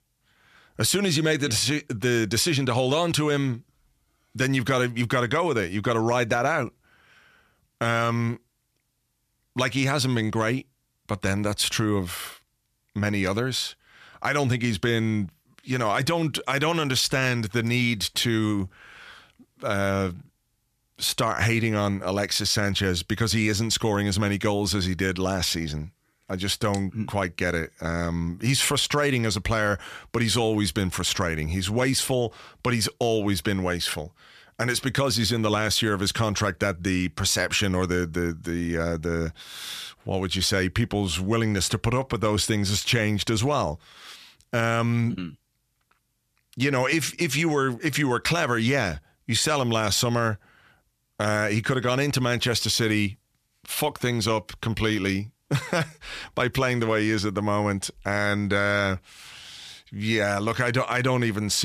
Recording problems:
abrupt cut into speech; at the end

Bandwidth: 14.5 kHz